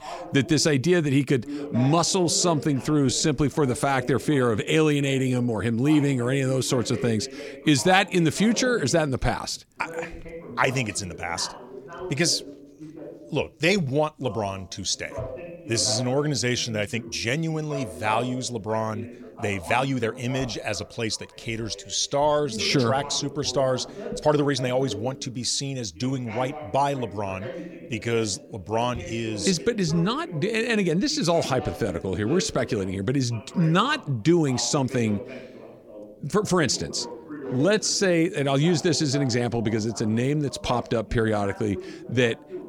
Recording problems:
voice in the background; noticeable; throughout; 15 dB below the speech
uneven, jittery; strongly; from 3 to 38 s

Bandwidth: 17.5 kHz